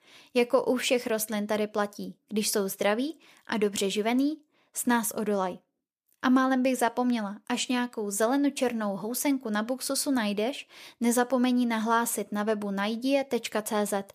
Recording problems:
none

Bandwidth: 14.5 kHz